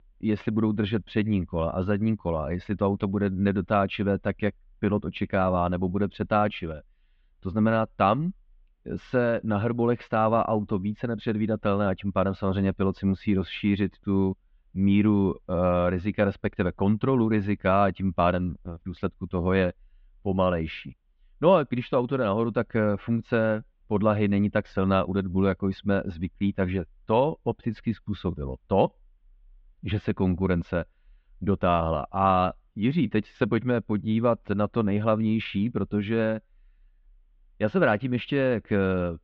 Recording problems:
muffled; very; fading above 3.5 kHz

